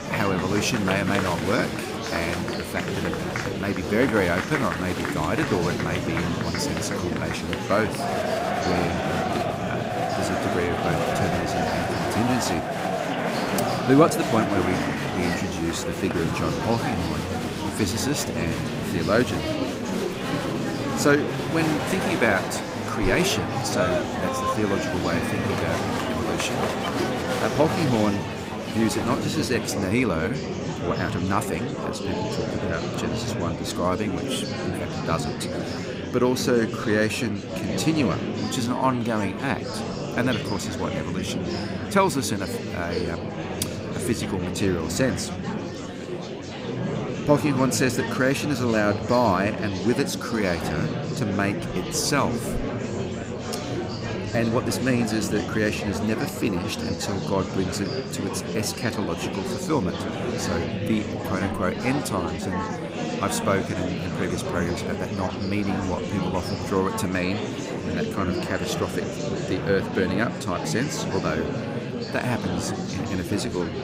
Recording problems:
murmuring crowd; loud; throughout; 2 dB below the speech

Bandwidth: 15.5 kHz